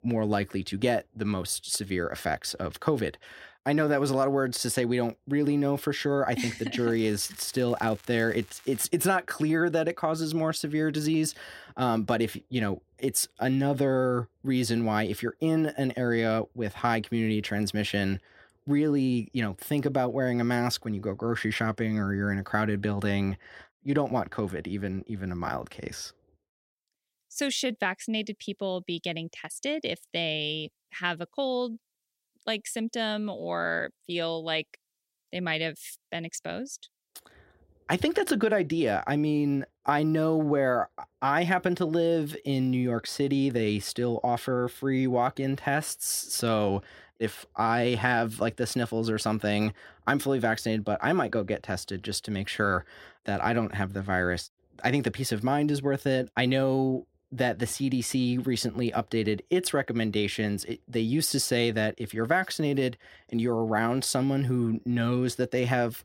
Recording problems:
crackling; faint; from 7 to 9 s; 25 dB below the speech

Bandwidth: 16 kHz